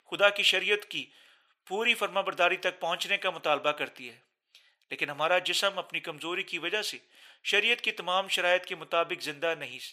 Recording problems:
thin; very; fading below 600 Hz

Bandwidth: 15 kHz